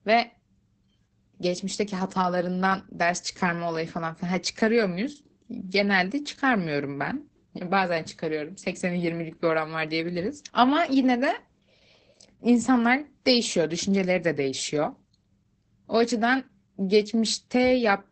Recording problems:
garbled, watery; badly; nothing above 8 kHz

